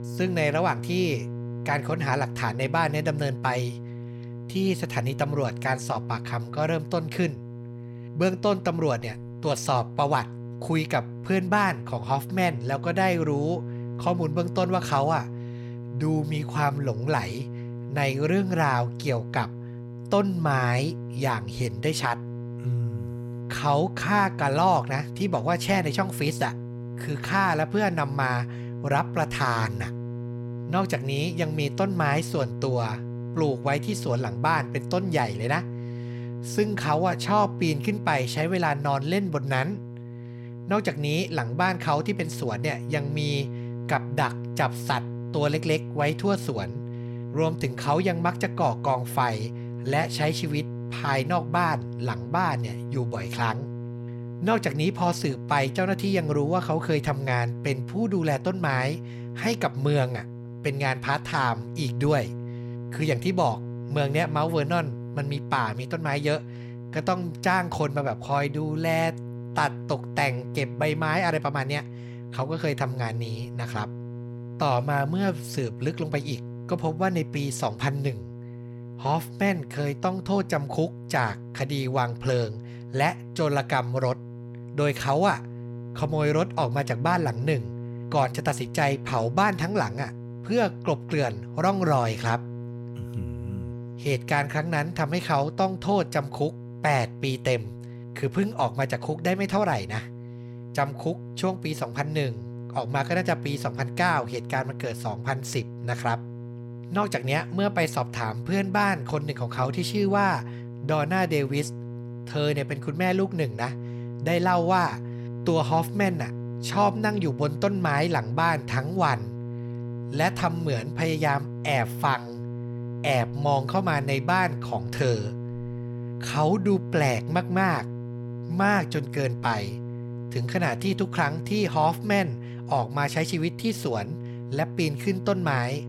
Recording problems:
electrical hum; noticeable; throughout; 60 Hz, 15 dB below the speech

